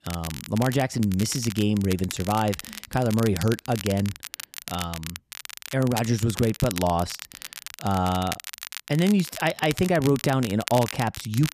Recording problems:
crackle, like an old record; noticeable; 10 dB below the speech

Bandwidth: 14.5 kHz